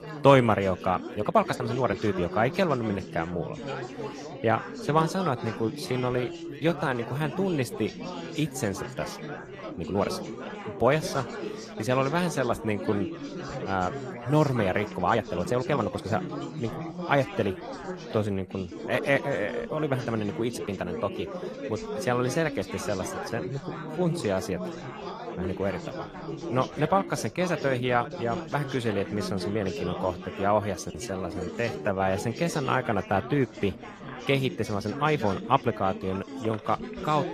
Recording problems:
garbled, watery; slightly; nothing above 15 kHz
chatter from many people; loud; throughout; 9 dB below the speech
uneven, jittery; strongly; from 1 to 36 s

